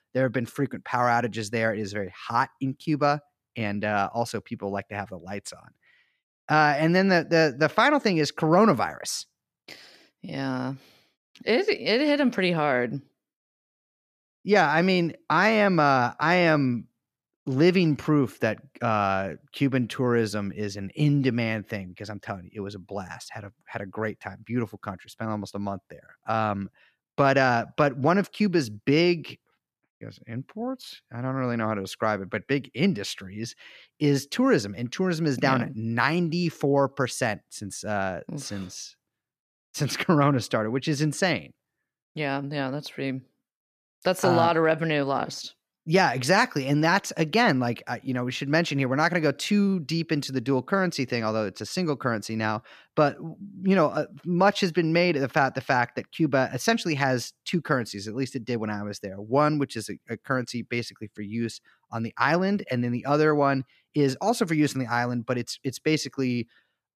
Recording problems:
none

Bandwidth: 14.5 kHz